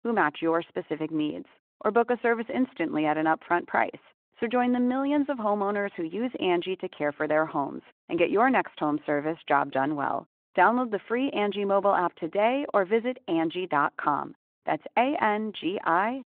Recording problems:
muffled; very; fading above 3.5 kHz
phone-call audio

